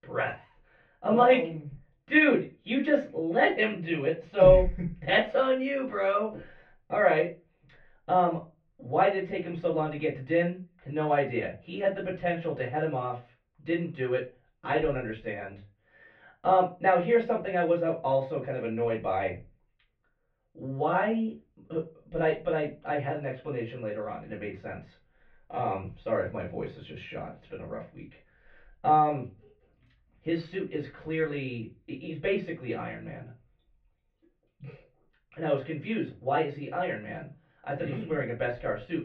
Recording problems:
off-mic speech; far
muffled; very; fading above 2.5 kHz
room echo; very slight; dies away in 0.2 s

